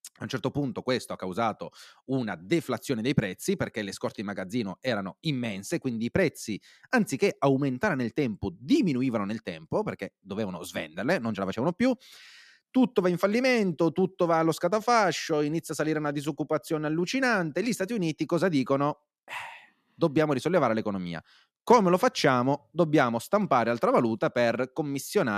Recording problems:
abrupt cut into speech; at the end

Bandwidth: 14.5 kHz